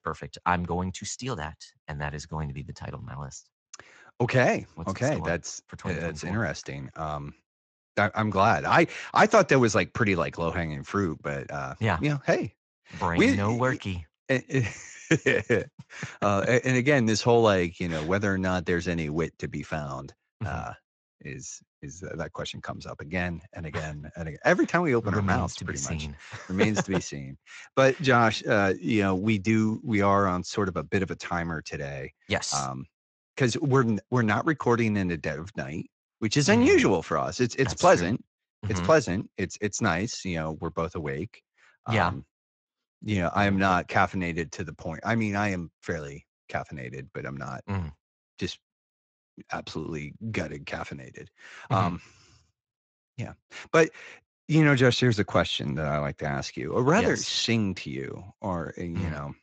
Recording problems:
garbled, watery; slightly; nothing above 7.5 kHz

